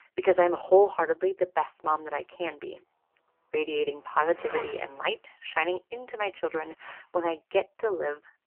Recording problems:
phone-call audio; poor line; nothing above 3 kHz
traffic noise; noticeable; throughout; 10 dB below the speech

